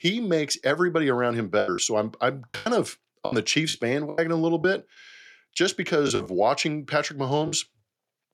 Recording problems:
choppy; very; 9% of the speech affected

